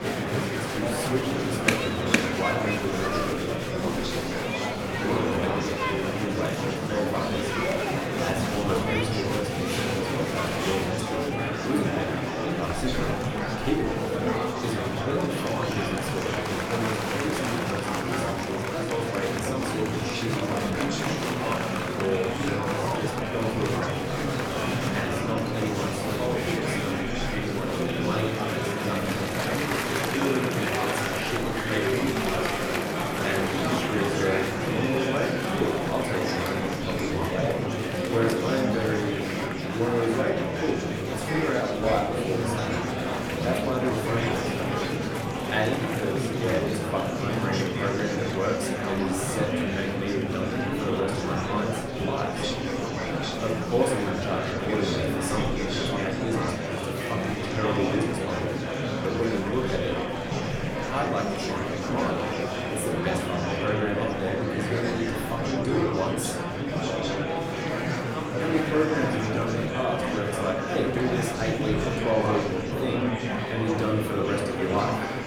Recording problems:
room echo; slight; dies away in 0.5 s
off-mic speech; somewhat distant
murmuring crowd; very loud; throughout; 2 dB above the speech
background music; faint; throughout; 20 dB below the speech

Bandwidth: 18 kHz